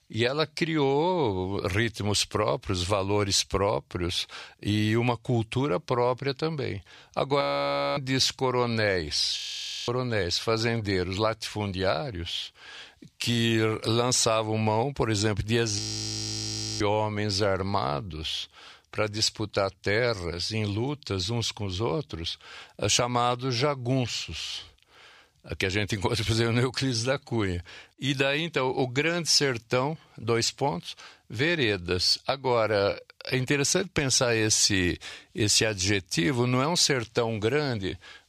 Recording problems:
audio freezing; at 7.5 s for 0.5 s, at 9.5 s for 0.5 s and at 16 s for 1 s

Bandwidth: 15 kHz